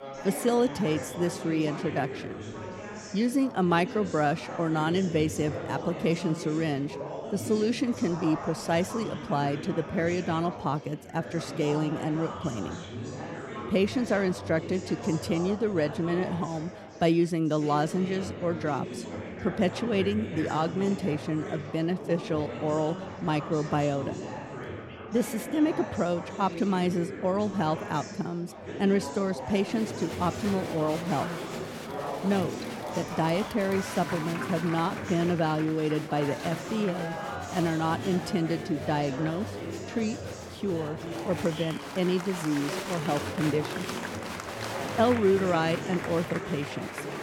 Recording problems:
murmuring crowd; loud; throughout; 8 dB below the speech

